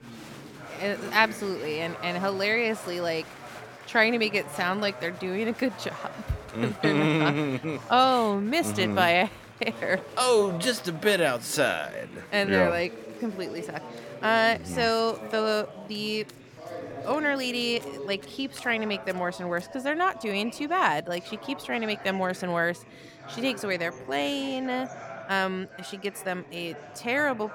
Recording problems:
murmuring crowd; noticeable; throughout; 15 dB below the speech
household noises; faint; throughout; 30 dB below the speech

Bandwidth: 17 kHz